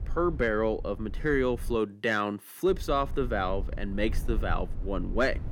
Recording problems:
low rumble; faint; until 2 s and from 2.5 s on; 25 dB below the speech

